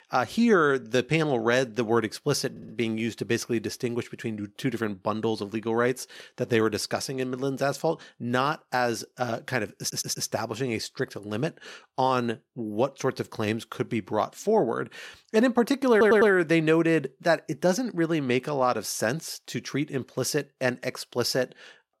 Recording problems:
audio stuttering; at 2.5 s, at 10 s and at 16 s

